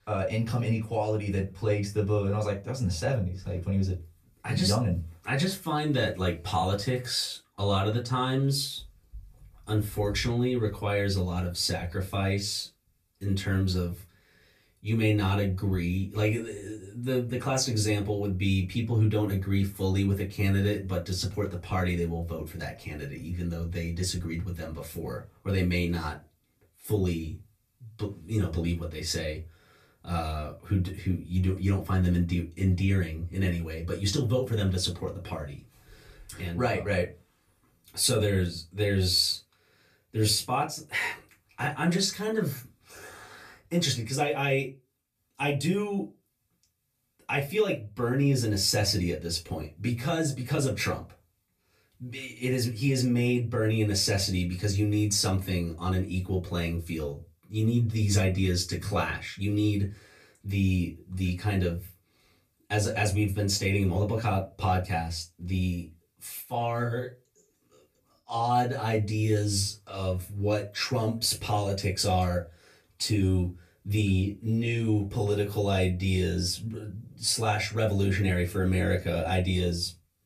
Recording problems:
off-mic speech; far
room echo; very slight; dies away in 0.2 s

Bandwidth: 14.5 kHz